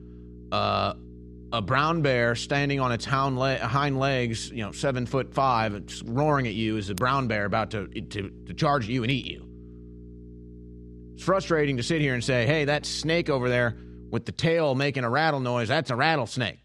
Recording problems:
electrical hum; faint; until 14 s; 60 Hz, 25 dB below the speech

